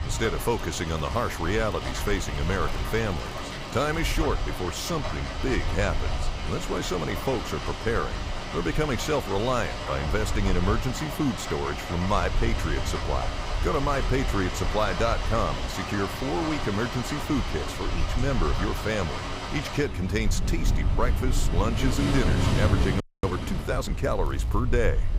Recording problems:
rain or running water; loud; throughout; 4 dB below the speech
low rumble; faint; throughout; 25 dB below the speech
crackling; faint; from 1 to 4 s and at 24 s; 25 dB below the speech
audio freezing; at 23 s

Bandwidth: 15.5 kHz